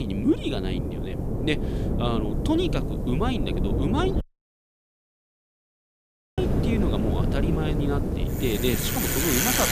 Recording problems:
traffic noise; very loud; from 6.5 s on; 1 dB above the speech
wind noise on the microphone; heavy; 4 dB below the speech
hiss; faint; throughout; 30 dB below the speech
abrupt cut into speech; at the start
audio cutting out; at 4 s for 2 s

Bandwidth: 14.5 kHz